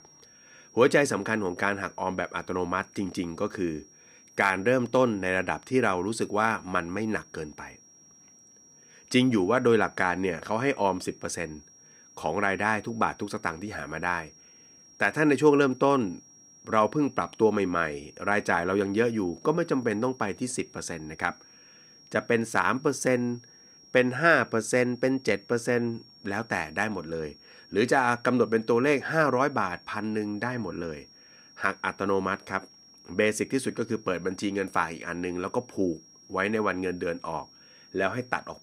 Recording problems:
high-pitched whine; faint; throughout; 5.5 kHz, 25 dB below the speech

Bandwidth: 15.5 kHz